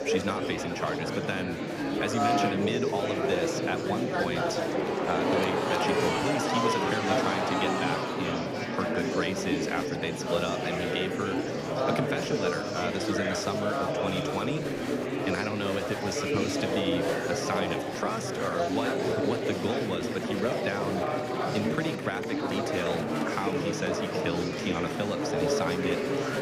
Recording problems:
murmuring crowd; very loud; throughout; 4 dB above the speech

